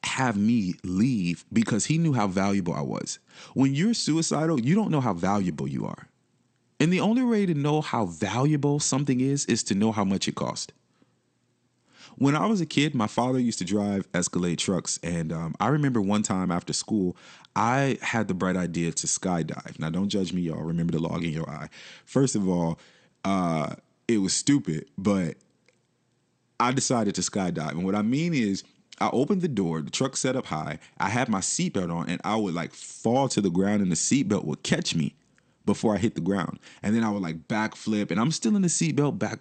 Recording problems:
garbled, watery; slightly; nothing above 8.5 kHz

